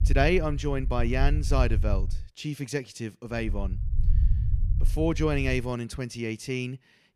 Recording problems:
low rumble; noticeable; until 2 s and from 3.5 to 5.5 s; 15 dB below the speech

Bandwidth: 14.5 kHz